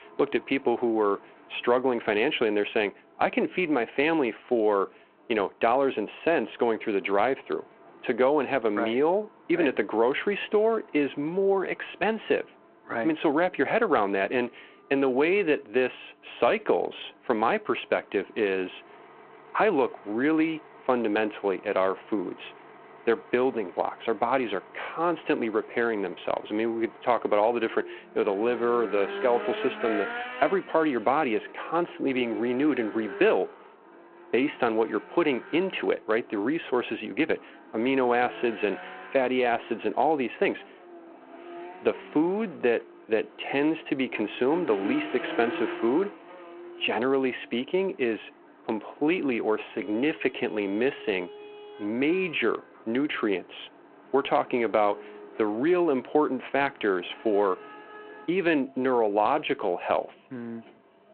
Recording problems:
phone-call audio
traffic noise; noticeable; throughout; 15 dB below the speech

